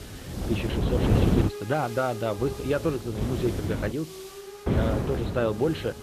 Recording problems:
high frequencies cut off; severe; nothing above 4 kHz
garbled, watery; slightly
wind noise on the microphone; heavy; until 1.5 s, from 2.5 to 4 s and from 4.5 s on; 4 dB below the speech
hiss; noticeable; throughout; 10 dB below the speech

